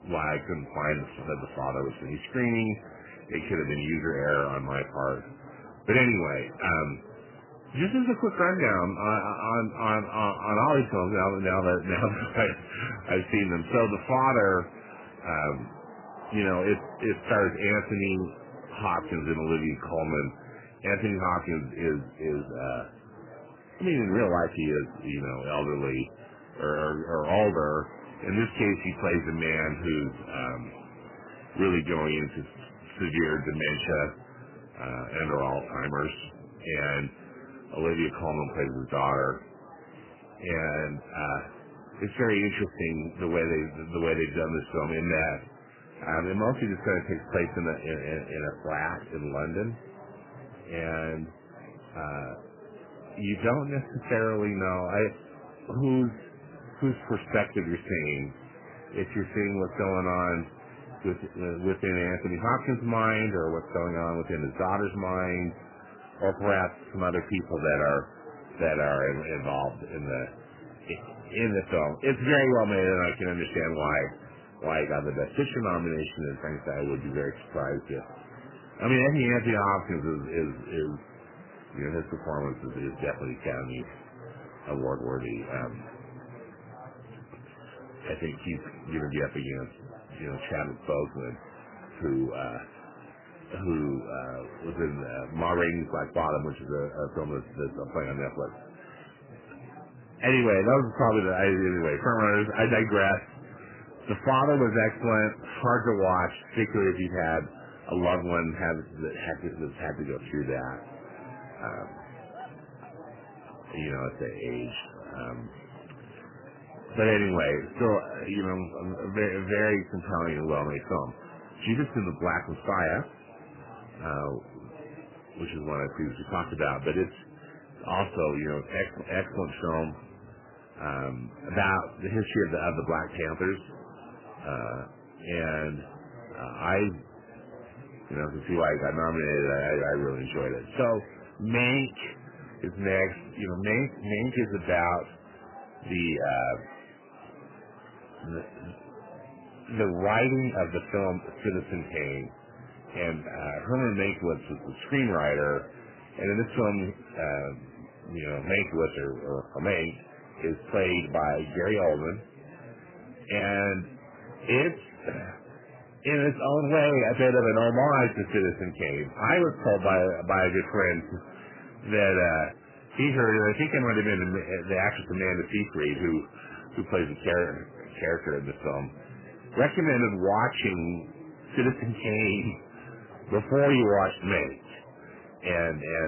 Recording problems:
garbled, watery; badly; nothing above 2.5 kHz
distortion; slight; 10 dB below the speech
murmuring crowd; noticeable; throughout; 20 dB below the speech
abrupt cut into speech; at the end

